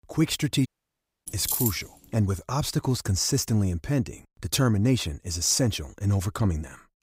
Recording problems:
audio cutting out; at 0.5 s for 0.5 s
jangling keys; noticeable; at 1.5 s; peak level with the speech

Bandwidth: 15.5 kHz